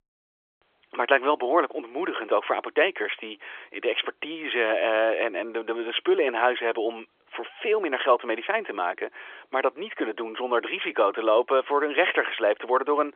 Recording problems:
phone-call audio; nothing above 3.5 kHz

